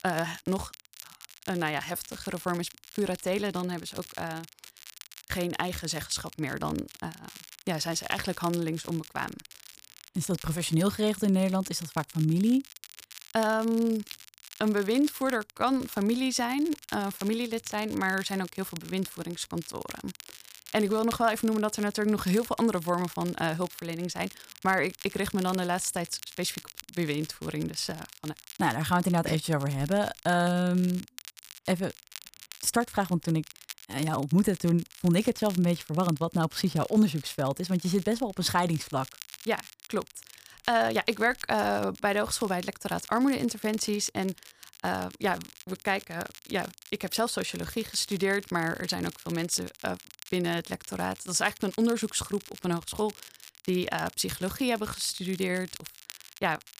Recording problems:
crackle, like an old record; noticeable; 15 dB below the speech

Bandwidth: 15 kHz